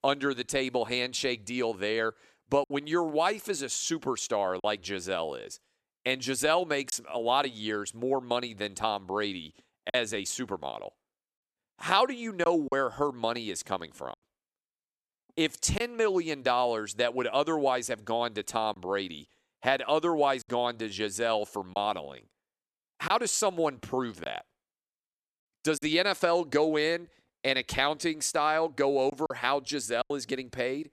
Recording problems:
choppy; occasionally; 2% of the speech affected

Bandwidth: 13.5 kHz